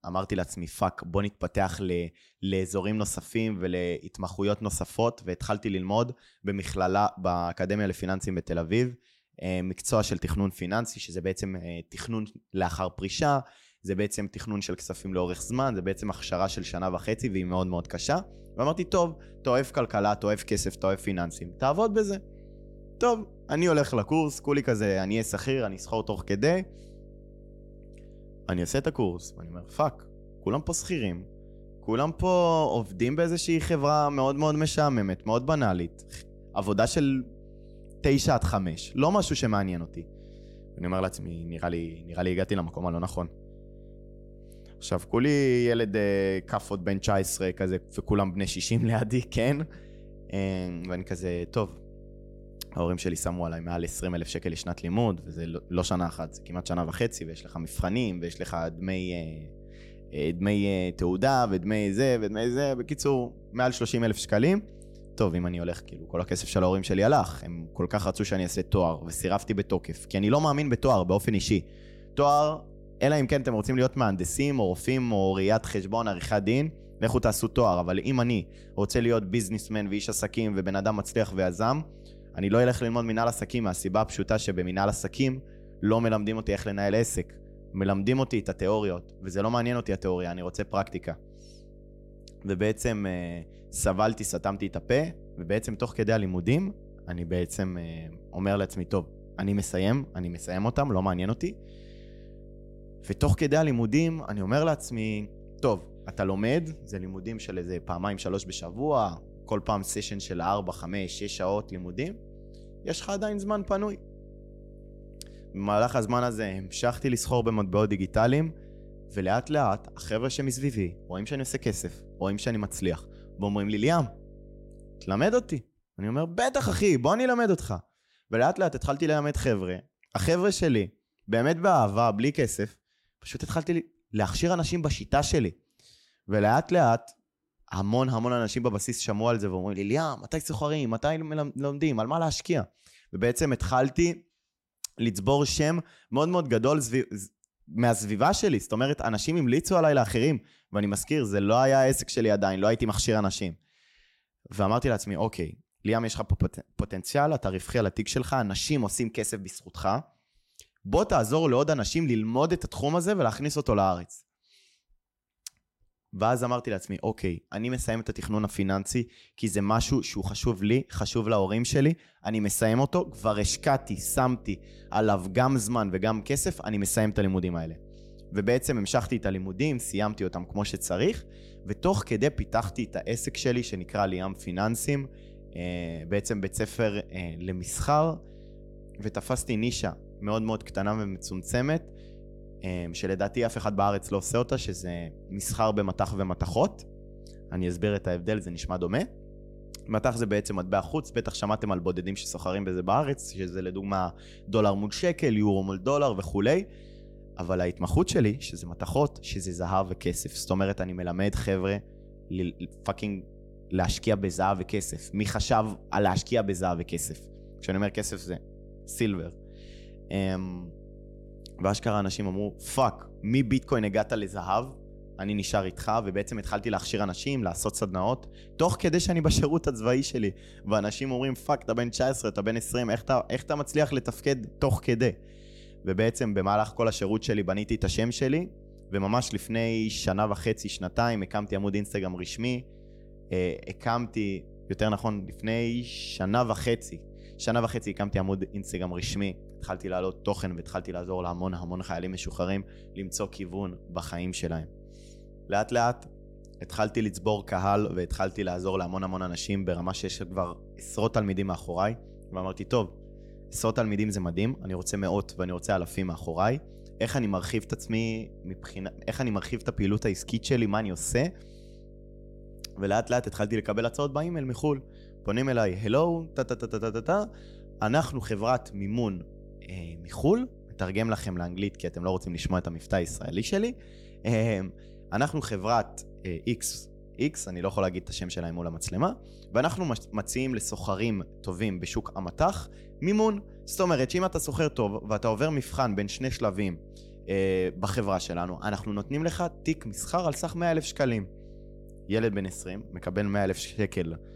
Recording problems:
electrical hum; faint; from 15 s to 2:06 and from 2:53 on; 50 Hz, 25 dB below the speech

